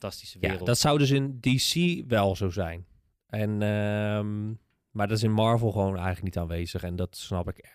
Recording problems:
none

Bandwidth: 15 kHz